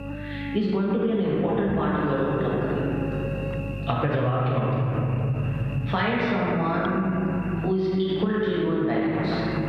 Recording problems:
room echo; strong; dies away in 3 s
off-mic speech; far
muffled; slightly; fading above 3.5 kHz
squashed, flat; somewhat
electrical hum; noticeable; throughout; 50 Hz, 15 dB below the speech
rain or running water; very faint; throughout; 15 dB below the speech

